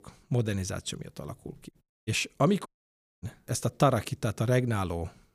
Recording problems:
audio cutting out; at 2 s and at 2.5 s for 0.5 s

